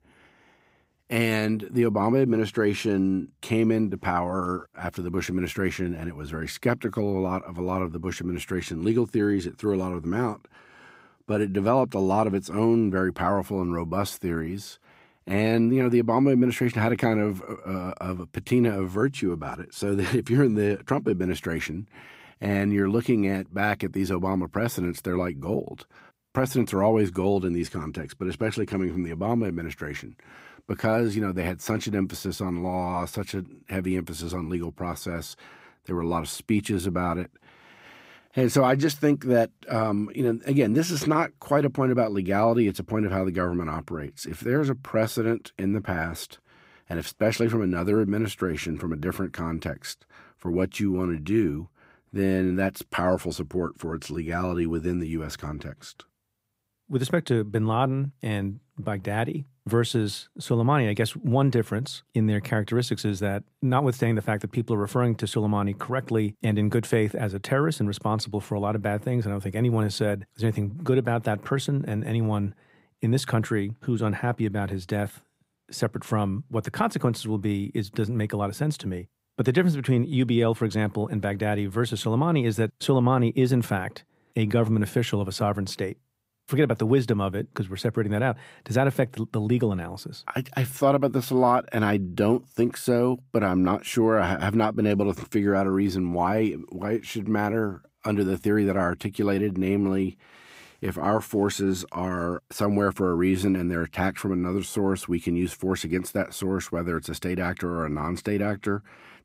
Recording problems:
none

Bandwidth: 15.5 kHz